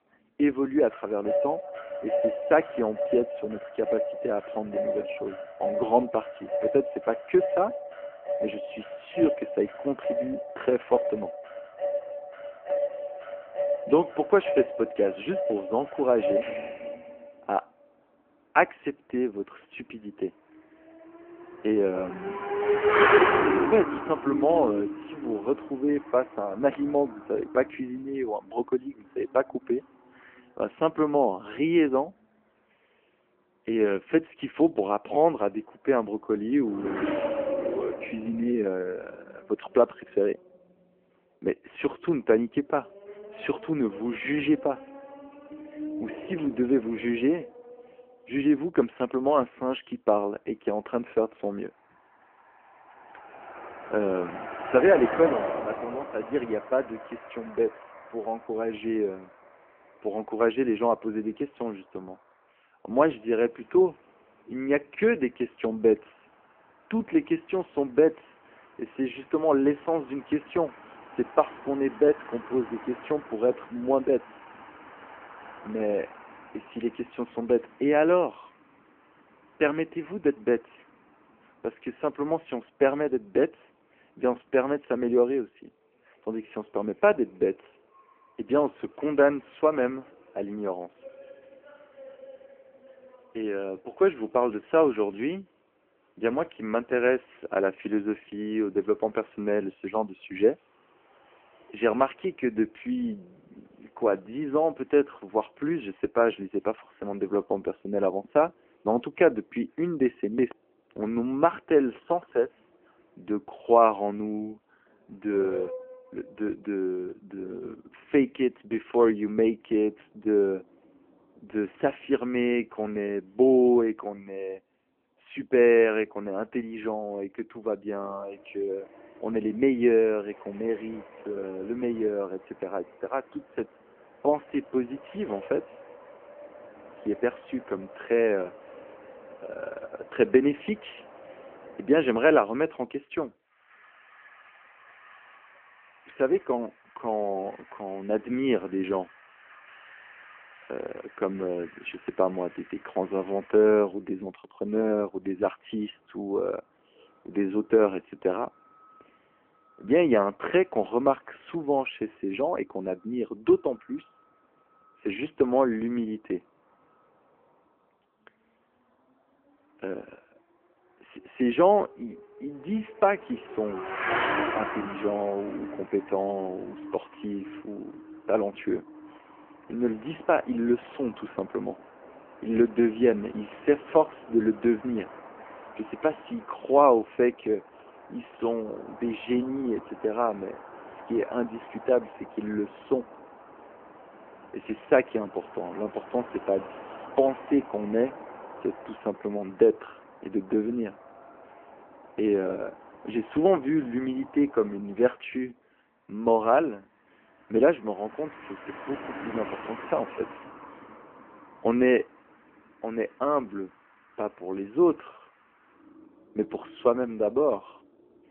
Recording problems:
phone-call audio; poor line
traffic noise; loud; throughout; 7 dB below the speech

